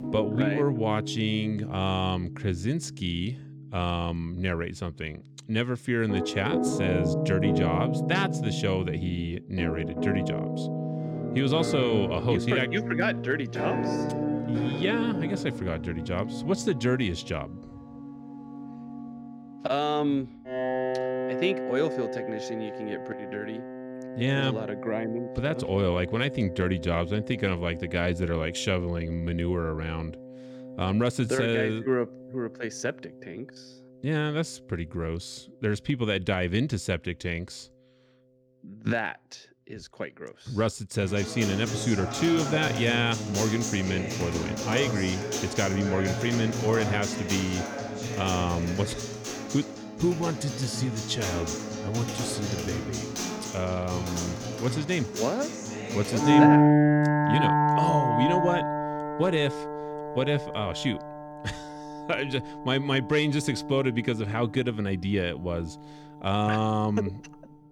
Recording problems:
background music; loud; throughout; 2 dB below the speech

